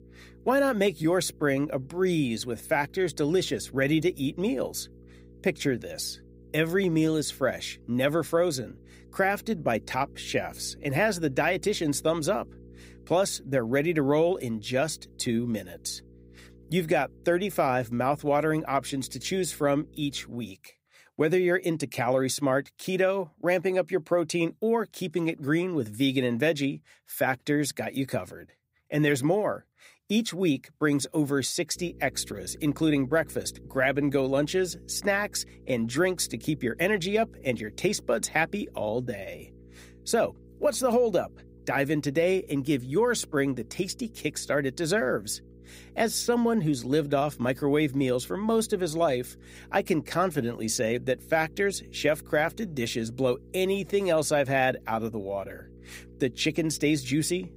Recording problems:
electrical hum; faint; until 20 s and from 32 s on; 60 Hz, 30 dB below the speech

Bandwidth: 15.5 kHz